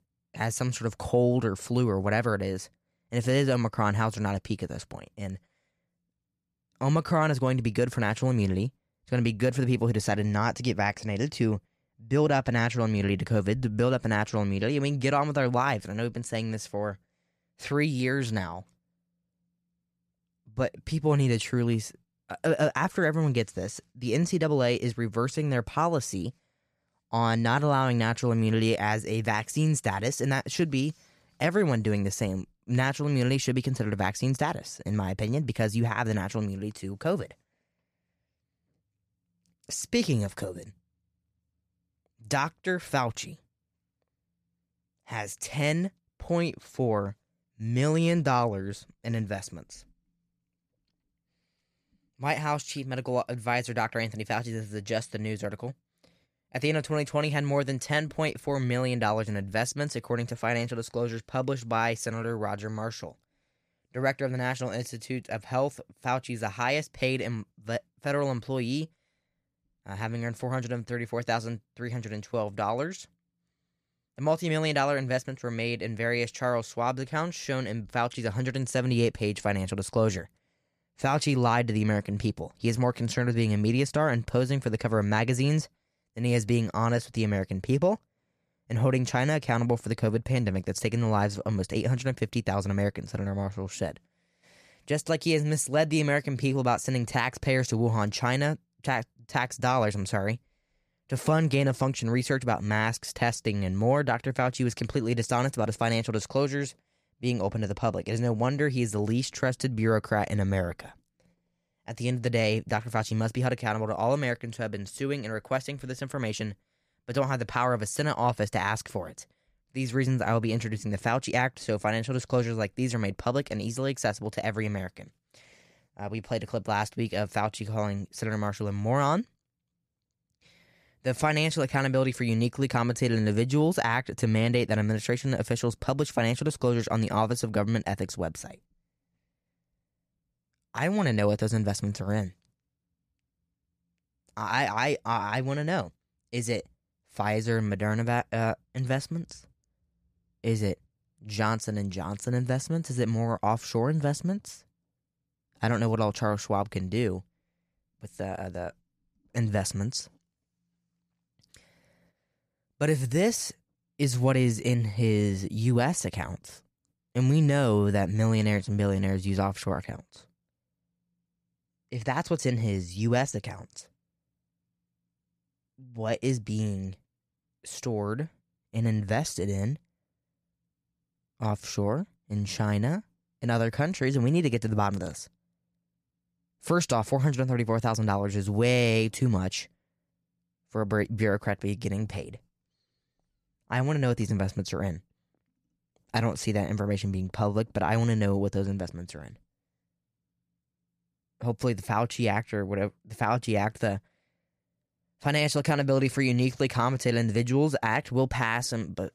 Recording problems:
none

